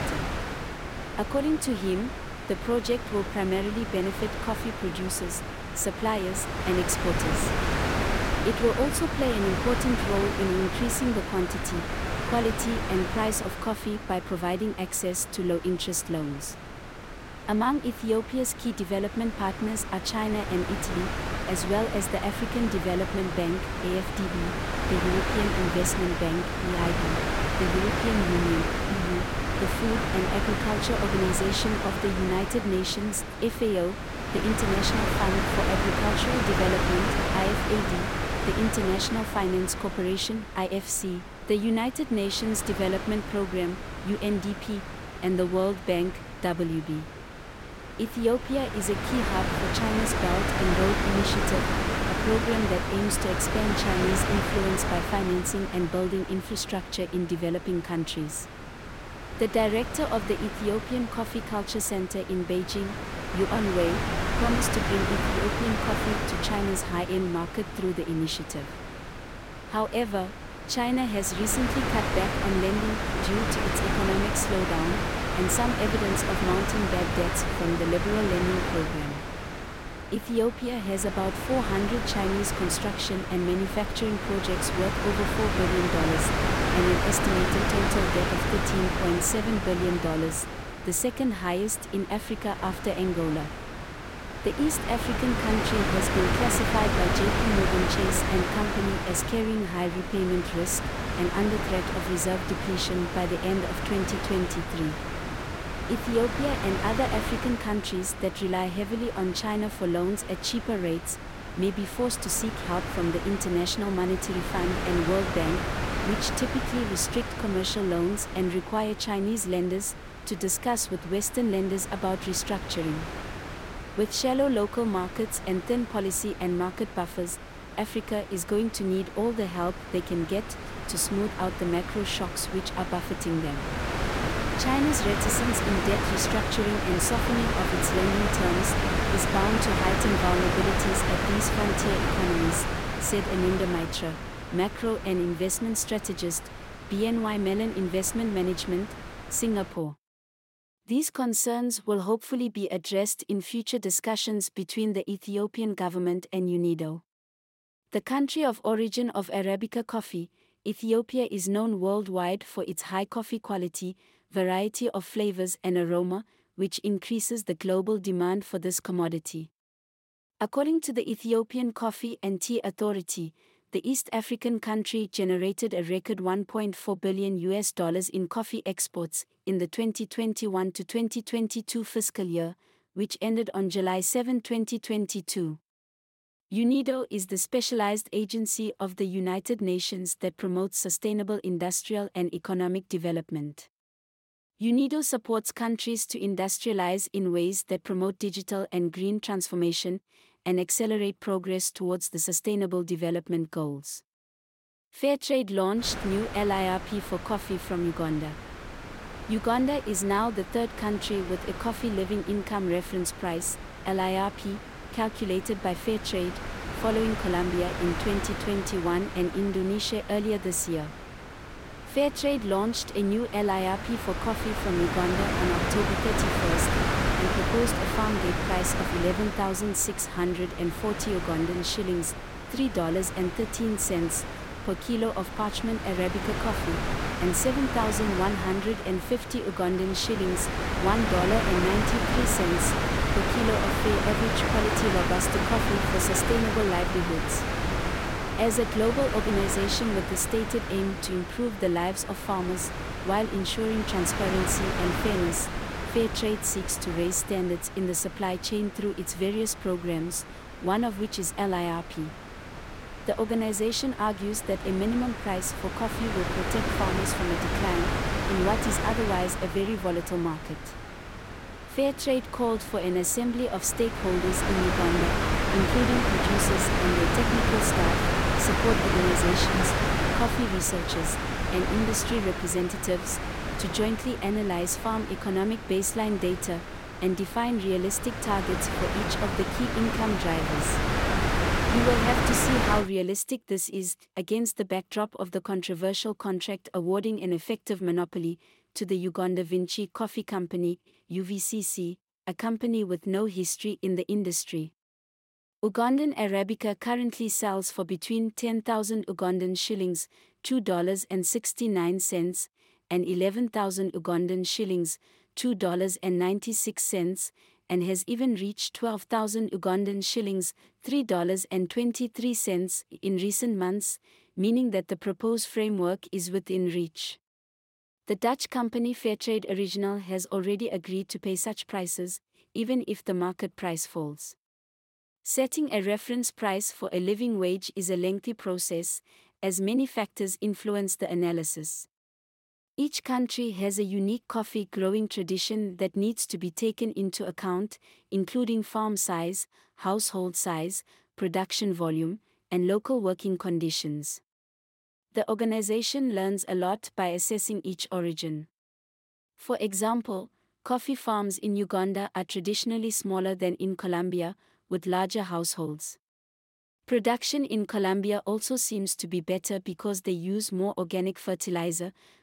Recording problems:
wind noise on the microphone; heavy; until 2:30 and from 3:26 to 4:53; as loud as the speech

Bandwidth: 16.5 kHz